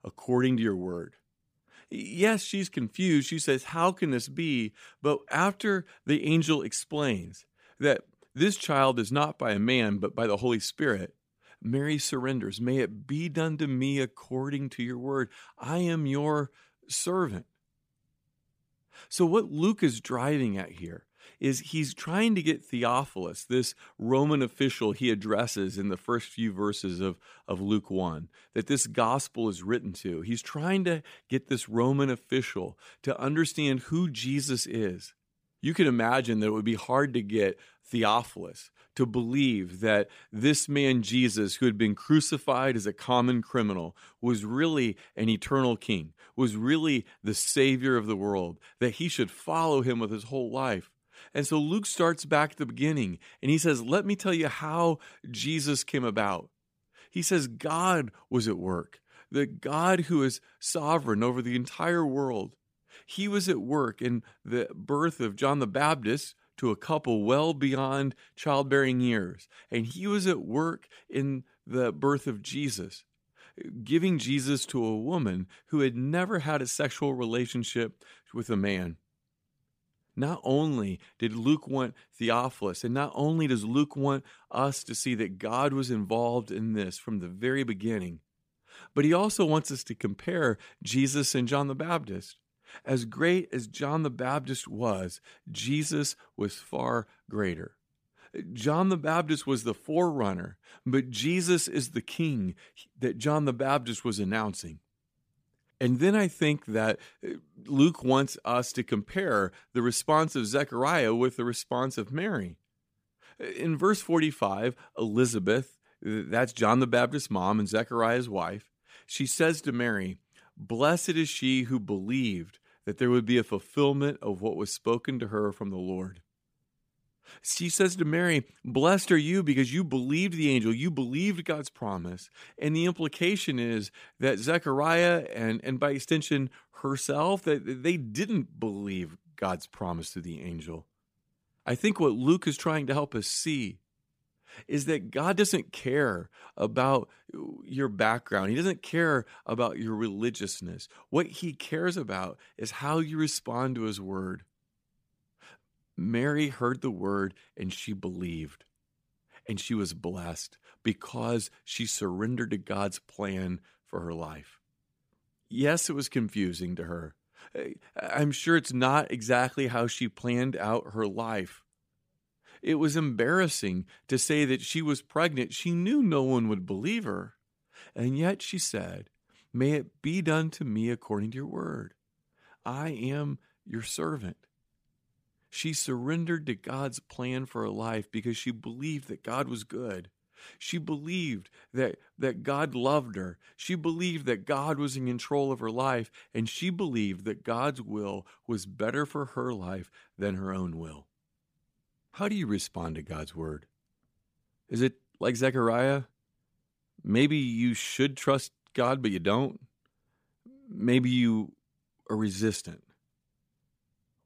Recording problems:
none

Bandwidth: 15 kHz